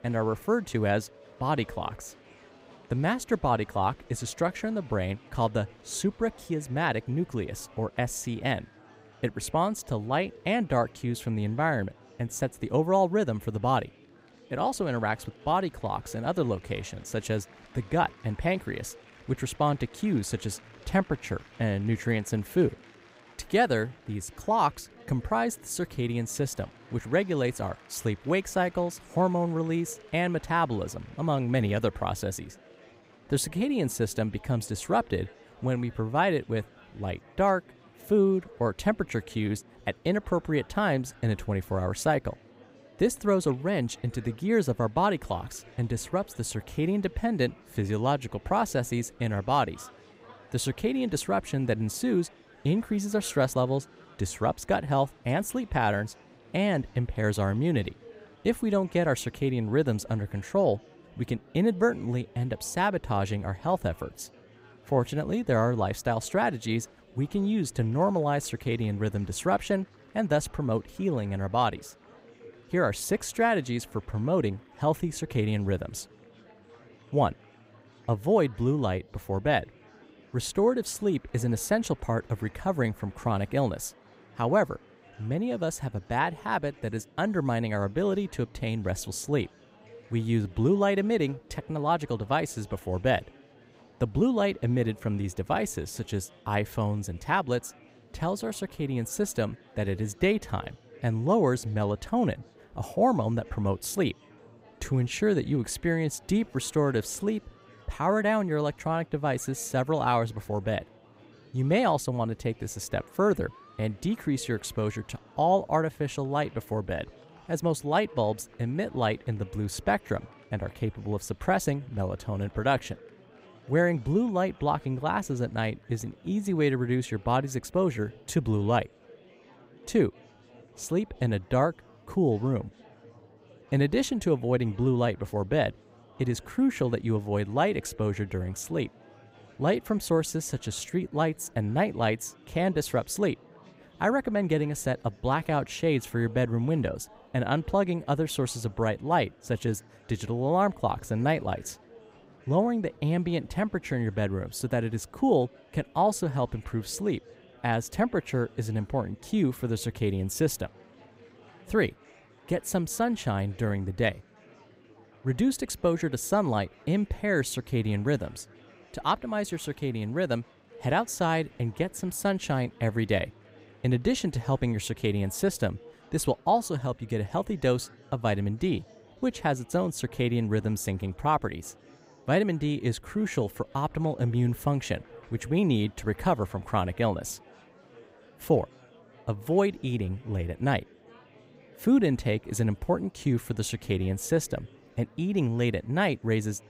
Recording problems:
murmuring crowd; faint; throughout; 25 dB below the speech

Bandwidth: 15.5 kHz